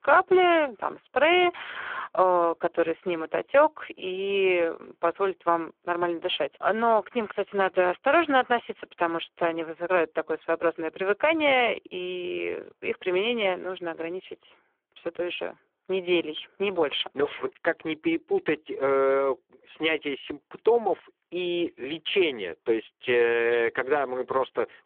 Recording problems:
phone-call audio; poor line; nothing above 3.5 kHz

